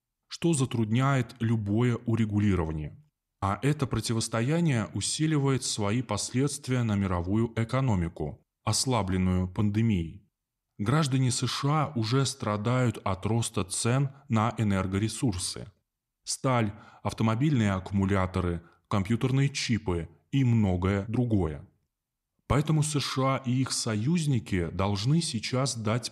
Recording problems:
none

